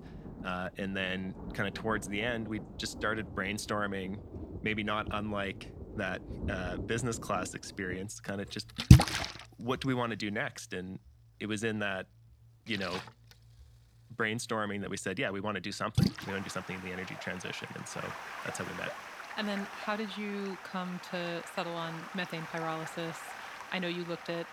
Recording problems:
rain or running water; very loud; throughout; 1 dB above the speech

